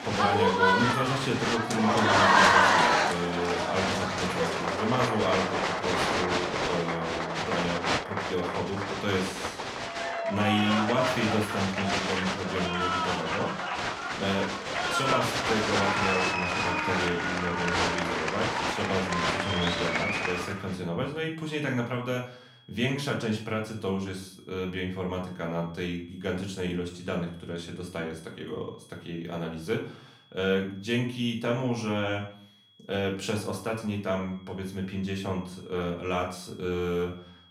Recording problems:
off-mic speech; far
room echo; slight; dies away in 0.4 s
crowd noise; very loud; until 21 s; 4 dB above the speech
high-pitched whine; faint; throughout; 3.5 kHz, 25 dB below the speech

